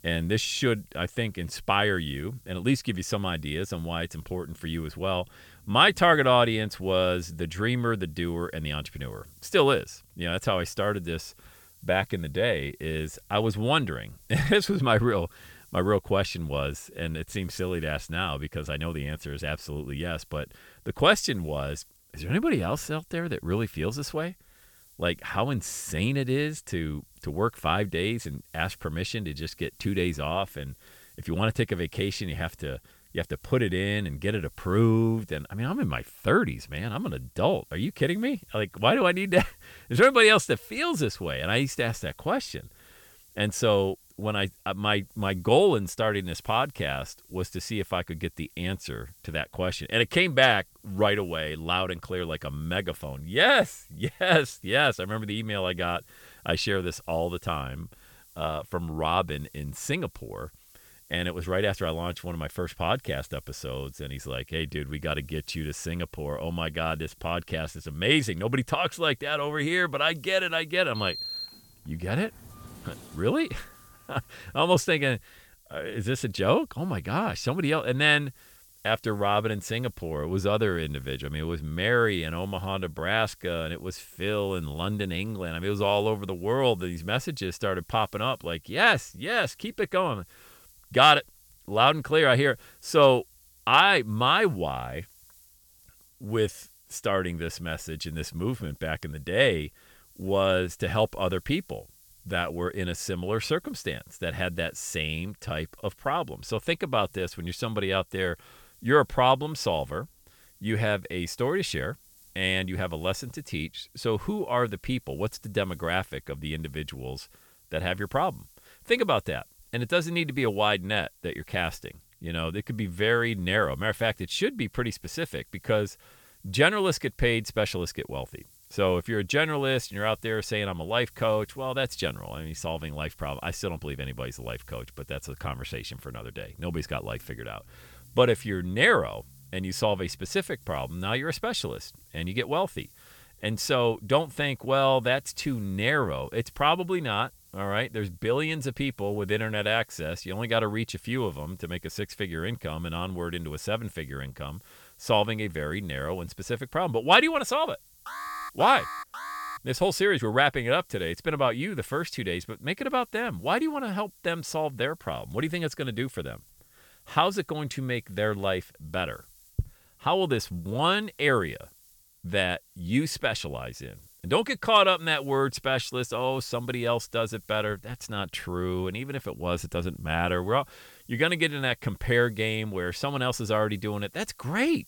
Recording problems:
hiss; faint; throughout; 30 dB below the speech
door banging; noticeable; from 1:11 to 1:14; peak 5 dB below the speech
alarm; noticeable; from 2:38 to 2:40; peak 8 dB below the speech

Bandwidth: 18 kHz